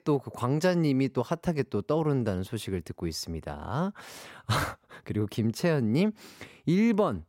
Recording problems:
none

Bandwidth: 16 kHz